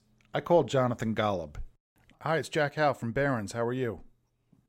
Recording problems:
none

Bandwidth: 16 kHz